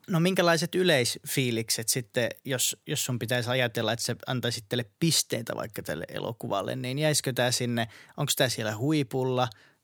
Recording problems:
none

